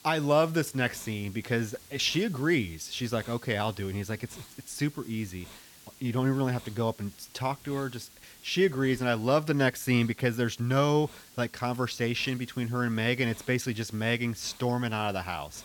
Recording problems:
hiss; faint; throughout; 20 dB below the speech

